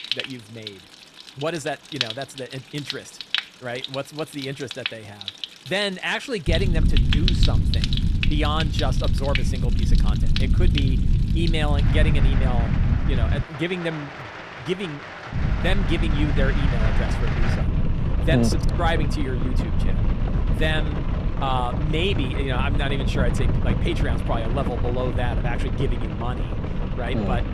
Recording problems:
rain or running water; loud; throughout; 4 dB below the speech
low rumble; loud; from 6.5 to 13 s and from 15 s on; 9 dB below the speech

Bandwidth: 13.5 kHz